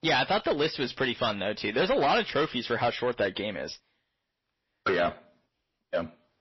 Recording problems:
distortion; heavy; 7% of the sound clipped
garbled, watery; slightly; nothing above 5.5 kHz

